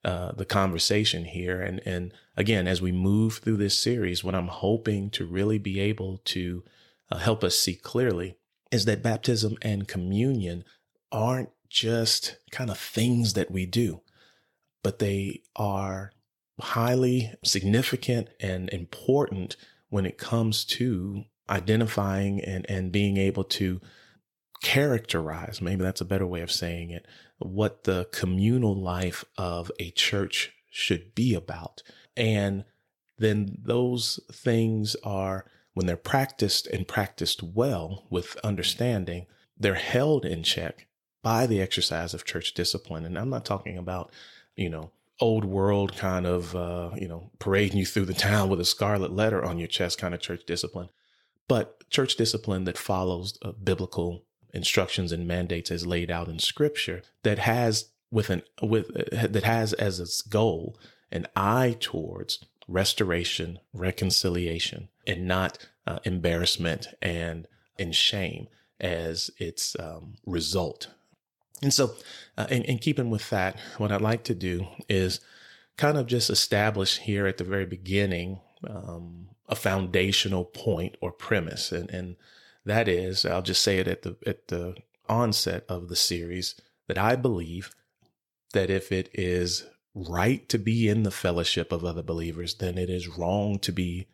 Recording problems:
none

